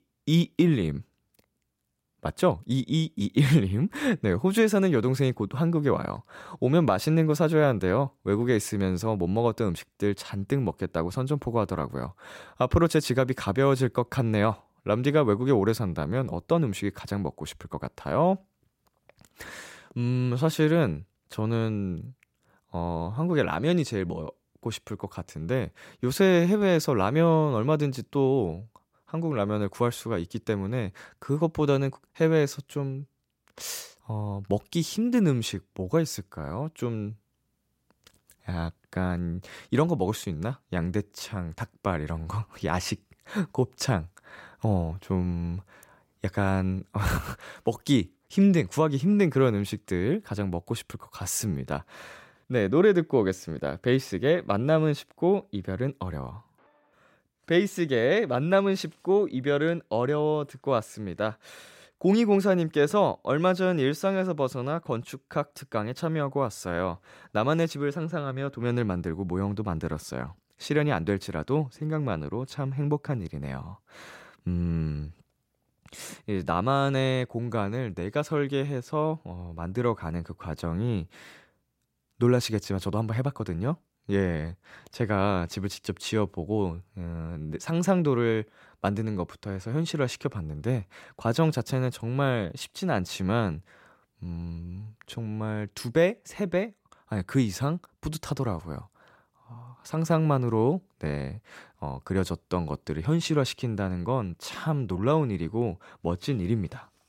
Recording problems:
none

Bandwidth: 16 kHz